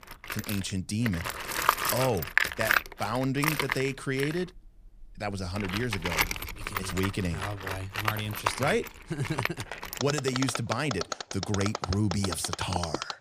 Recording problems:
machinery noise; very loud; throughout; as loud as the speech

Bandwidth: 15 kHz